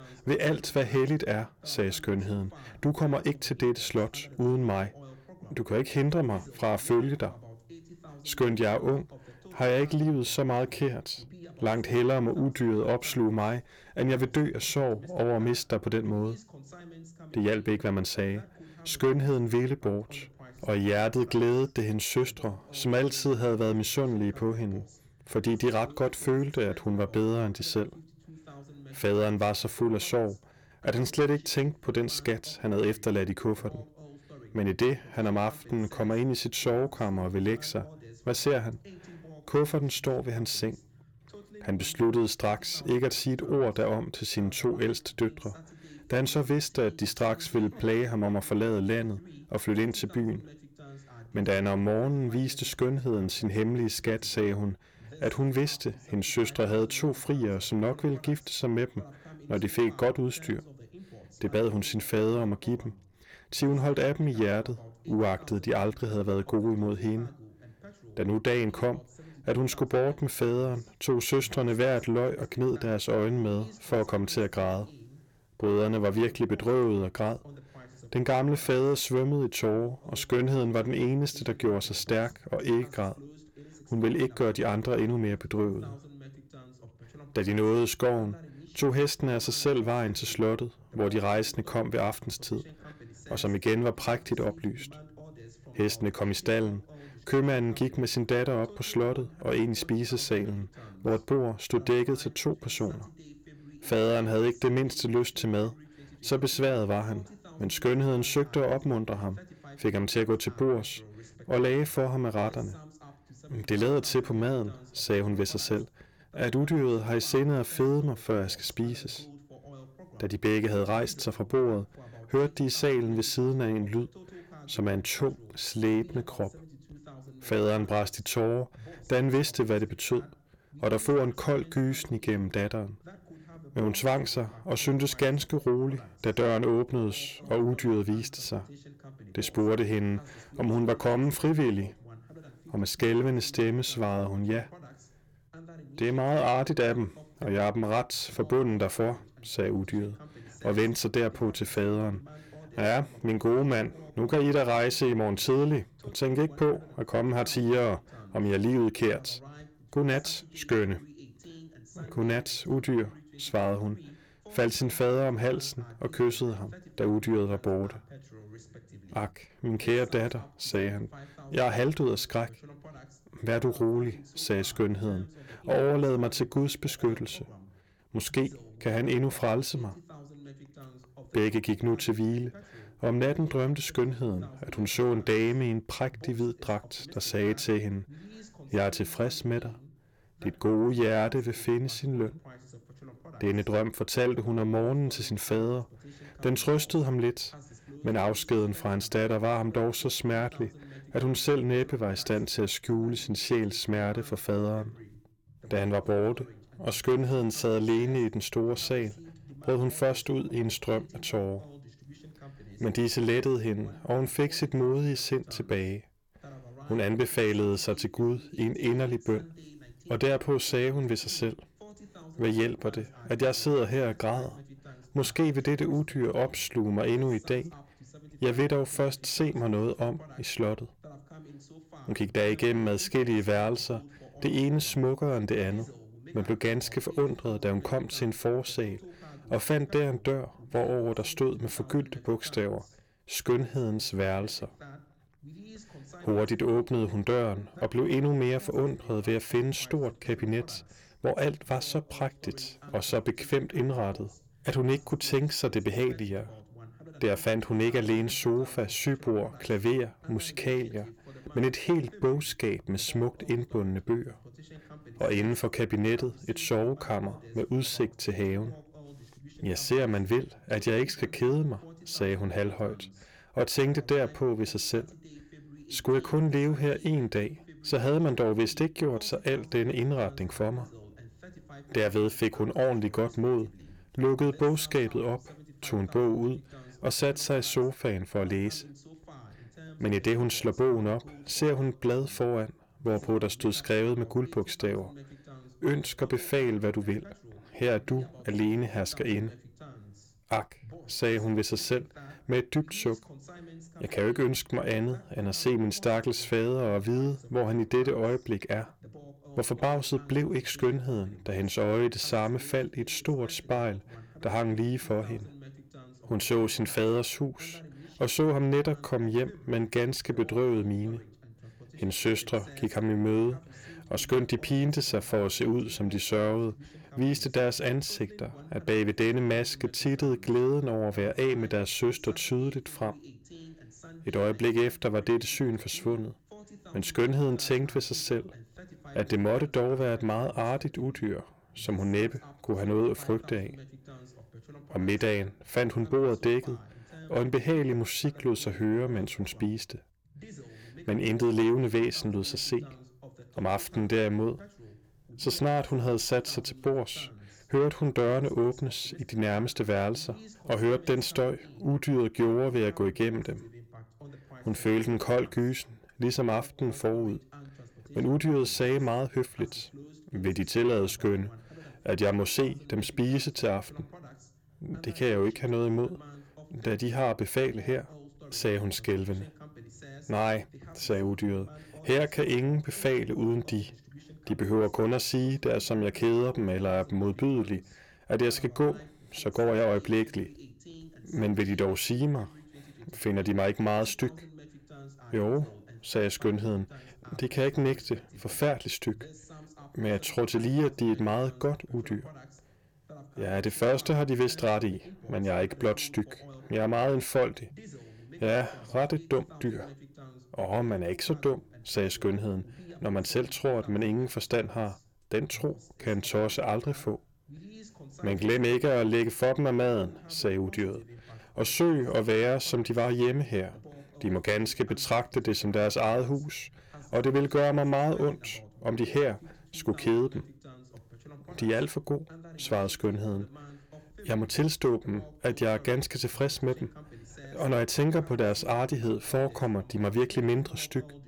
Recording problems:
distortion; slight; 10 dB below the speech
voice in the background; faint; throughout; 20 dB below the speech

